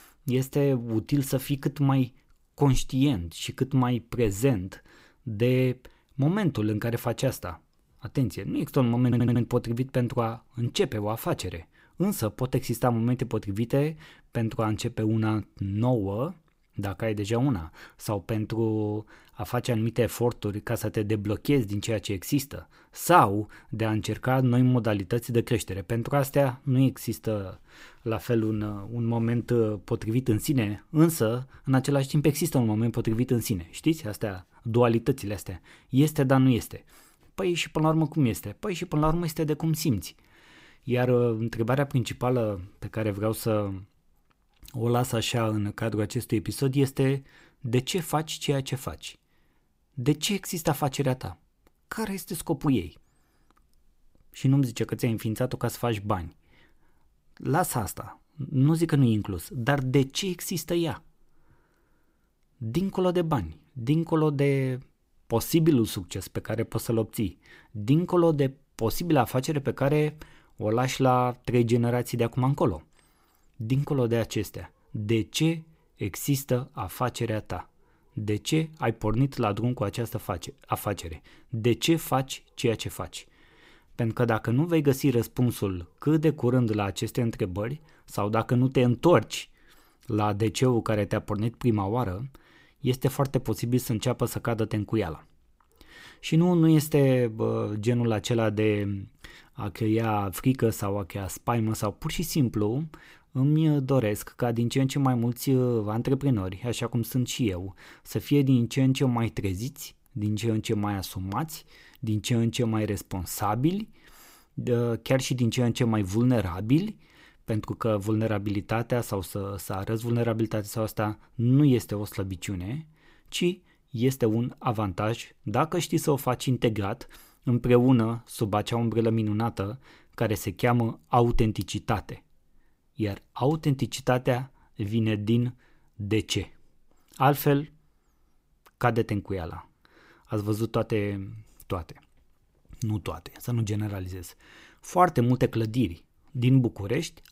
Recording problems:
audio stuttering; at 9 s

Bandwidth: 15.5 kHz